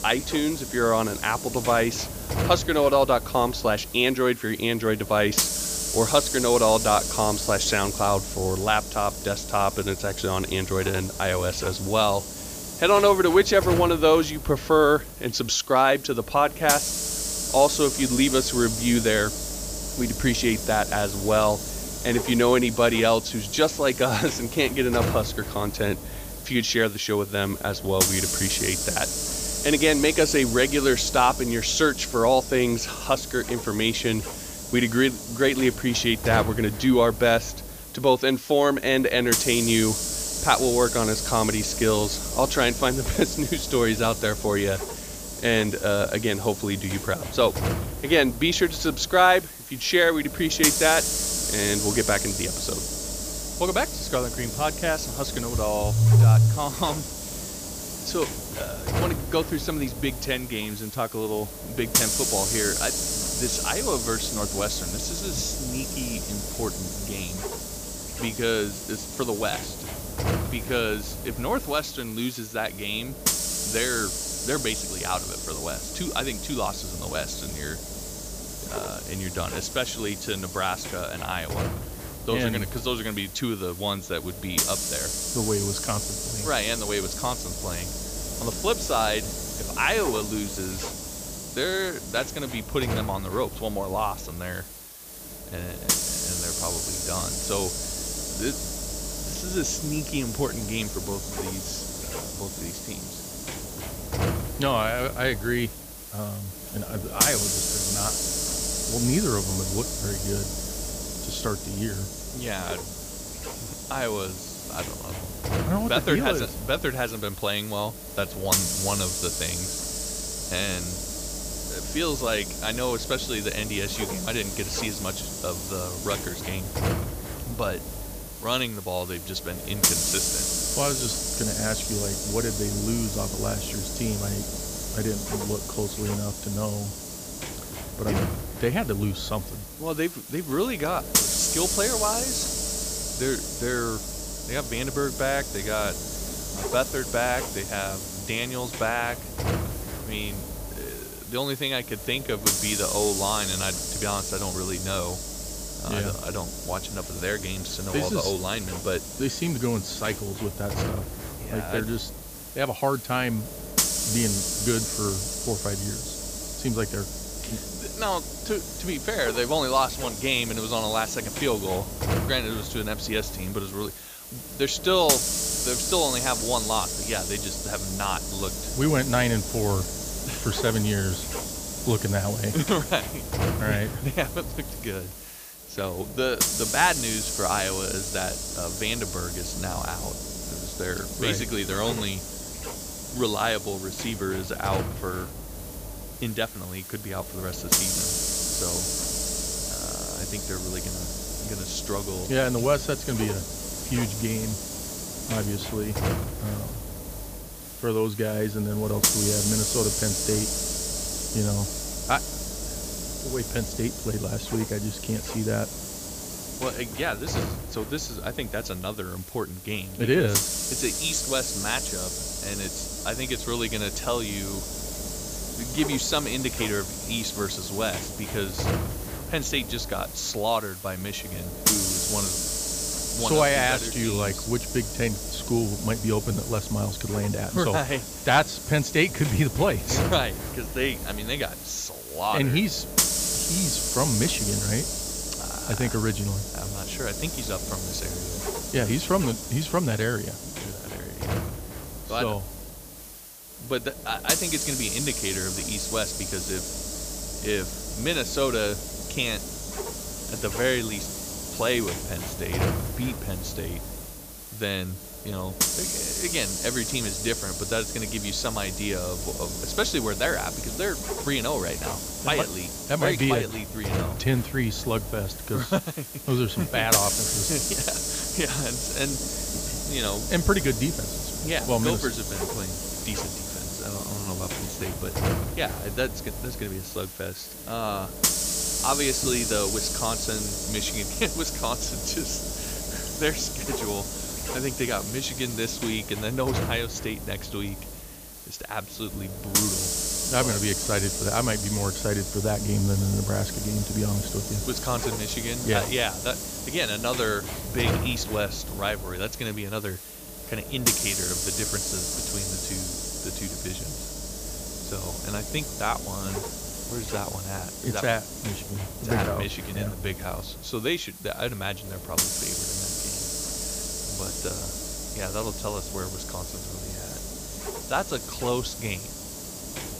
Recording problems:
high frequencies cut off; noticeable; nothing above 8 kHz
hiss; loud; throughout; 3 dB below the speech

